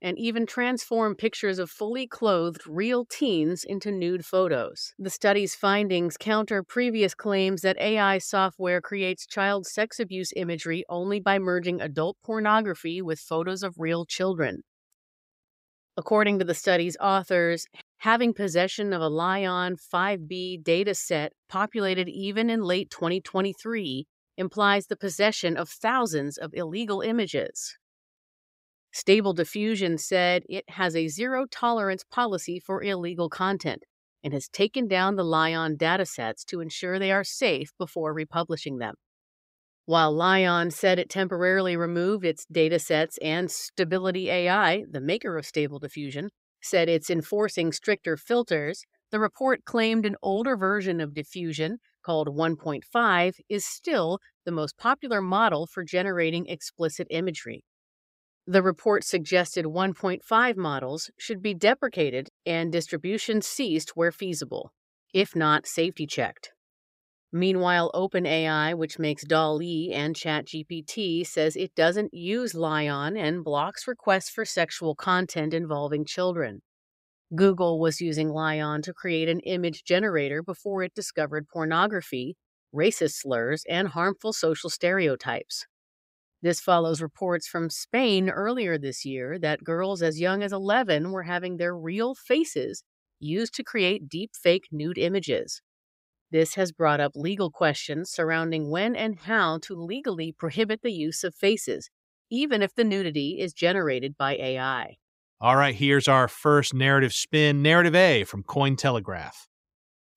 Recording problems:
none

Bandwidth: 15.5 kHz